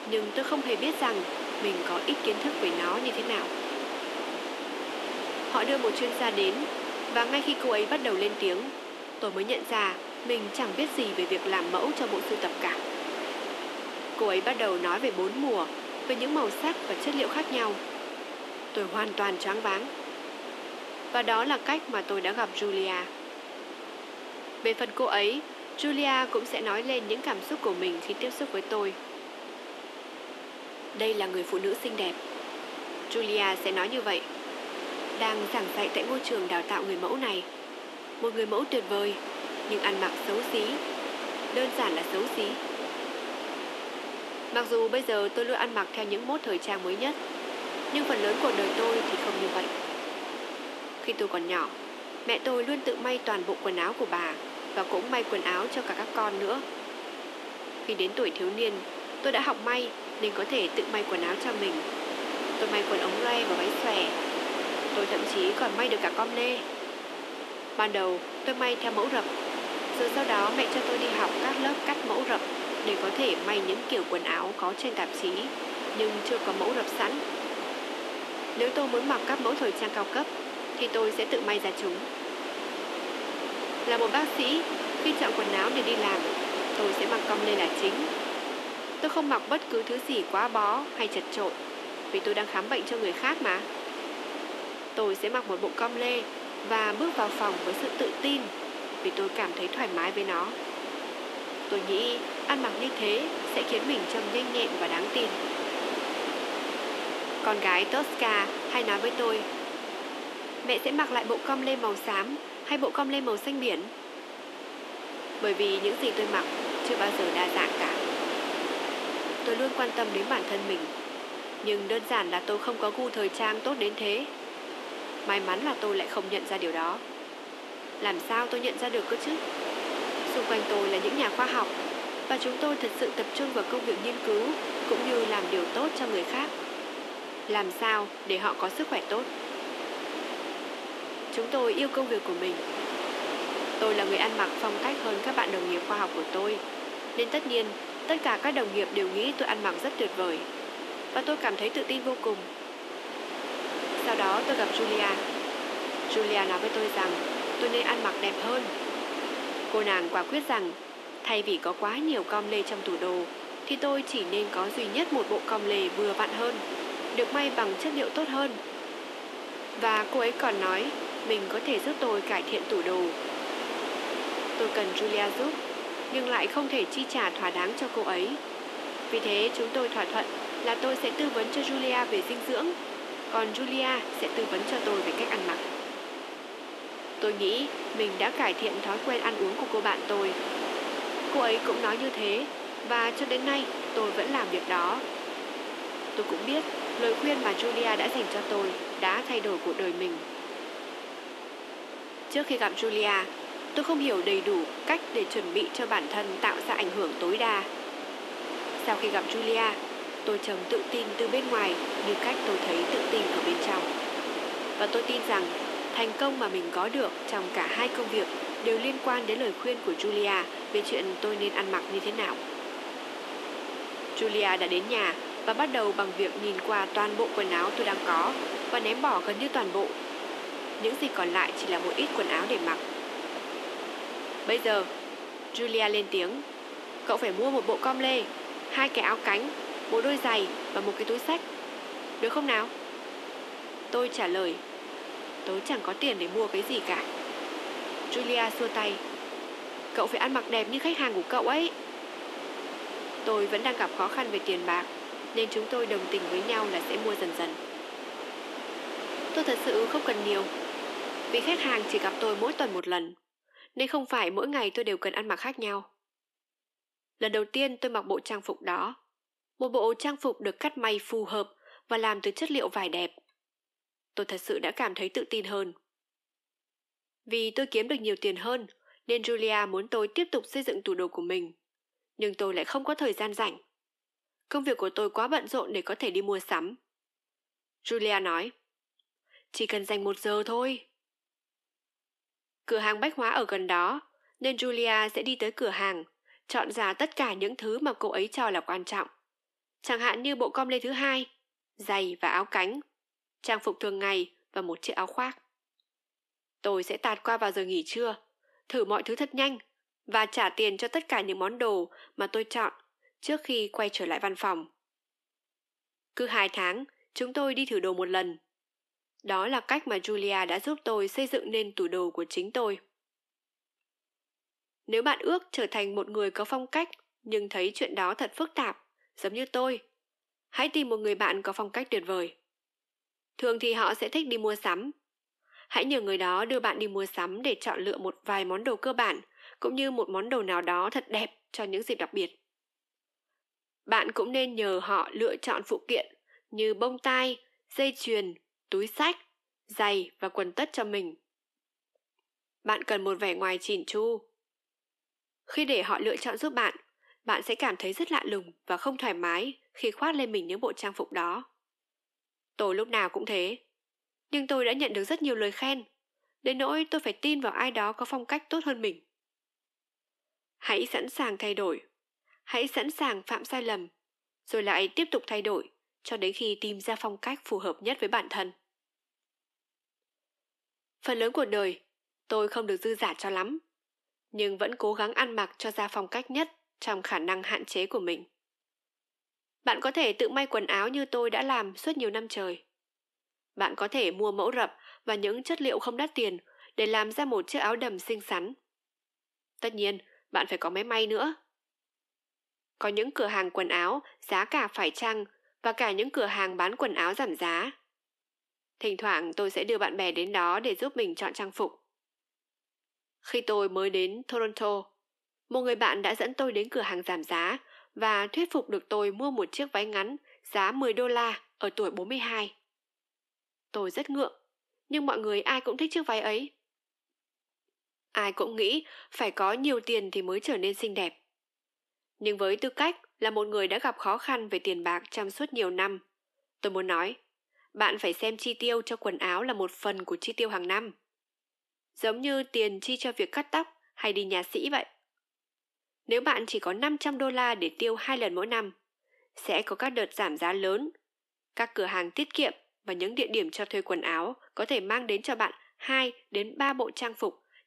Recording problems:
thin; somewhat; fading below 250 Hz
wind noise on the microphone; heavy; until 4:23; 5 dB below the speech

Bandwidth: 13.5 kHz